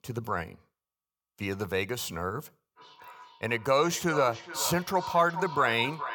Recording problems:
echo of what is said; strong; from 3 s on; 420 ms later, 9 dB below the speech

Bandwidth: 18.5 kHz